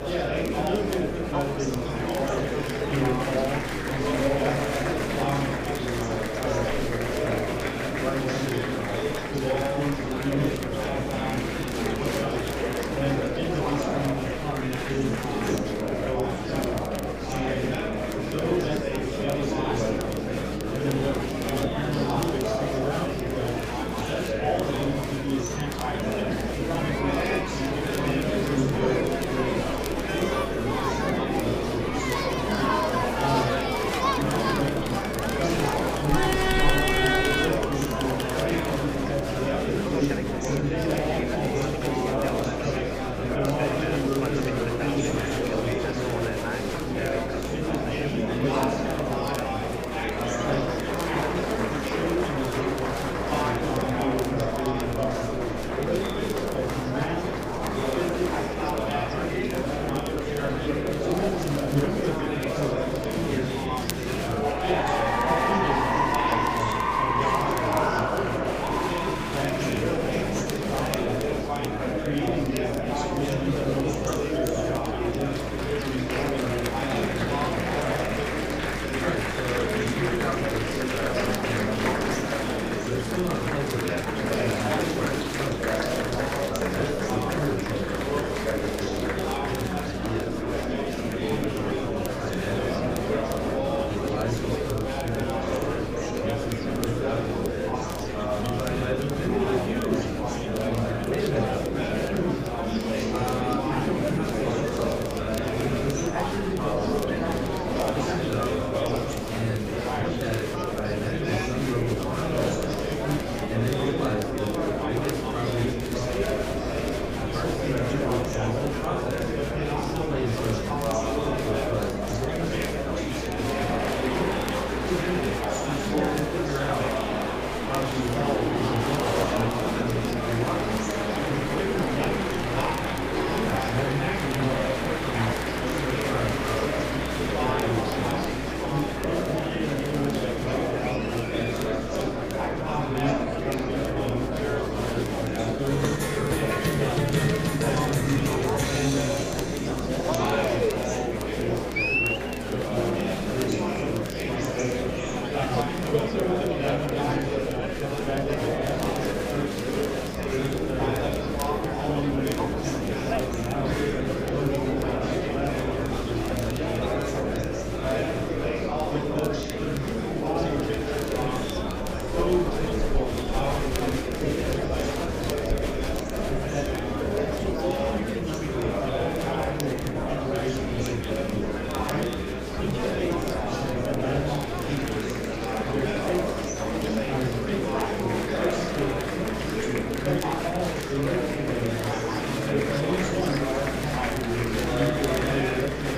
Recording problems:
off-mic speech; far
room echo; slight; dies away in 0.4 s
murmuring crowd; very loud; throughout; 5 dB above the speech
electrical hum; noticeable; throughout; 60 Hz, 15 dB below the speech
crackle, like an old record; noticeable; 15 dB below the speech

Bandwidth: 15 kHz